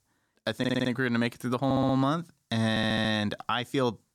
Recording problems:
audio stuttering; at 0.5 s, at 1.5 s and at 2.5 s

